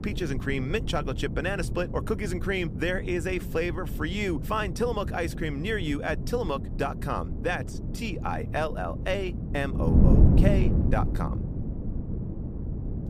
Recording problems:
wind noise on the microphone; heavy; 8 dB below the speech

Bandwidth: 15 kHz